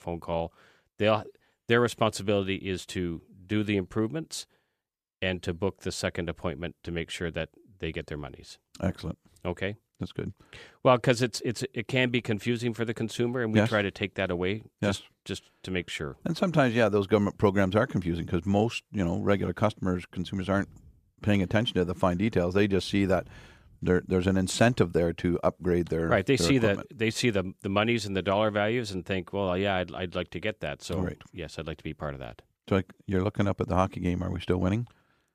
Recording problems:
none

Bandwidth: 14.5 kHz